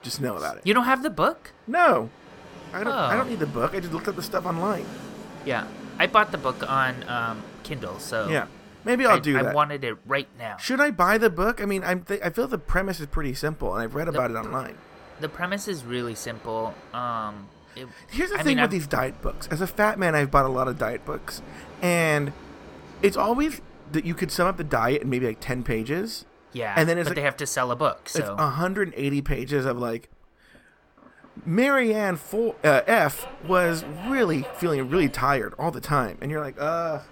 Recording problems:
train or aircraft noise; noticeable; throughout; 20 dB below the speech

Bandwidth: 17 kHz